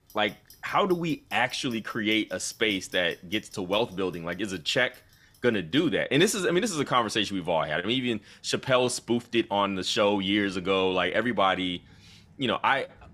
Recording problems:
household noises; faint; throughout; 30 dB below the speech

